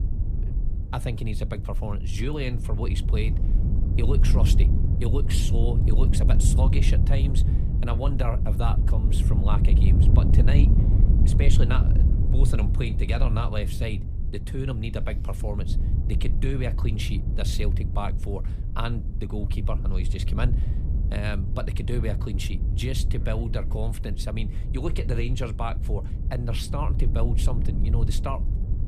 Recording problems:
wind noise on the microphone; heavy; 5 dB below the speech

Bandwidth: 15 kHz